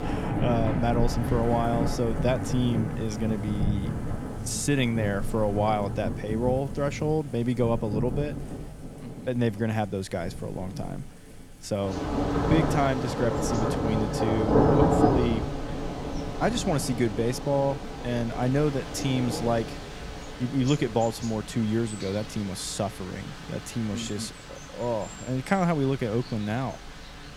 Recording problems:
rain or running water; loud; throughout; 2 dB below the speech

